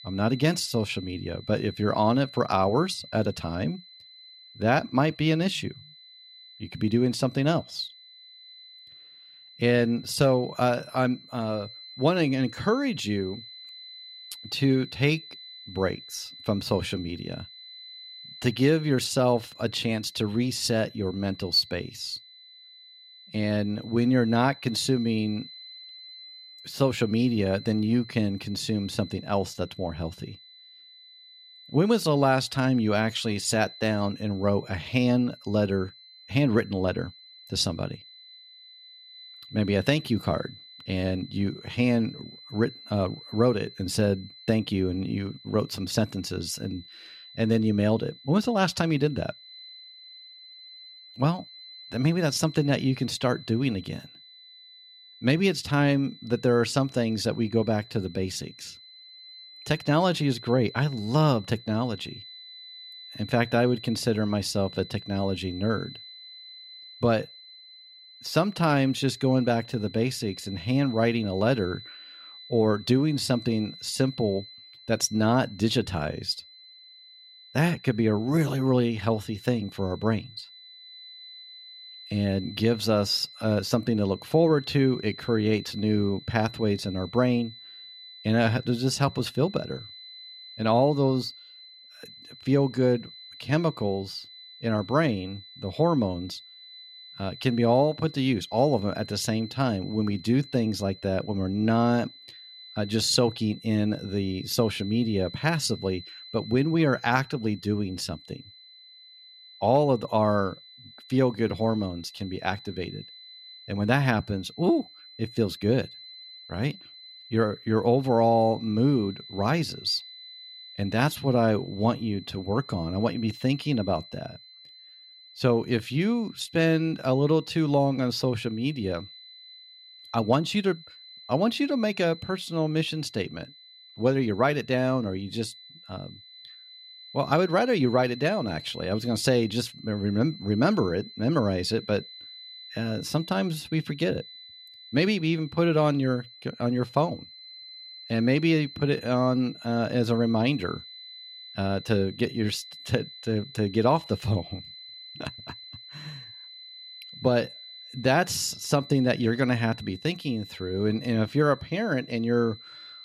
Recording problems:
high-pitched whine; noticeable; throughout; 4 kHz, 20 dB below the speech

